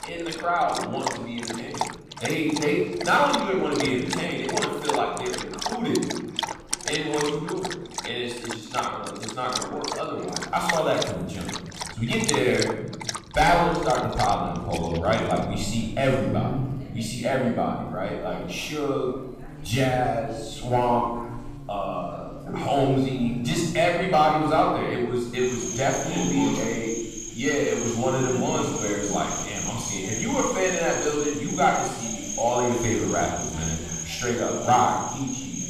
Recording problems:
off-mic speech; far
room echo; noticeable; dies away in 1.1 s
animal sounds; loud; throughout; 7 dB below the speech
background chatter; faint; throughout; 2 voices, 20 dB below the speech

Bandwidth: 15 kHz